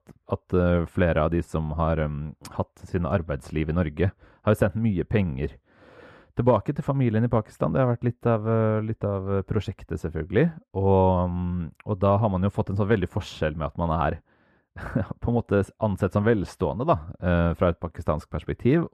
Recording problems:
muffled; very; fading above 2.5 kHz

